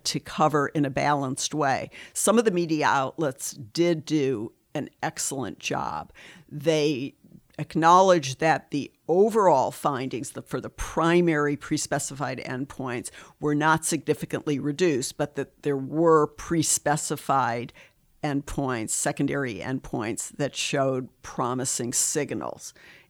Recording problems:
none

